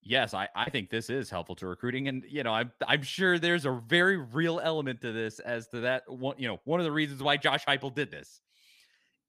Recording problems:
none

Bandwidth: 15 kHz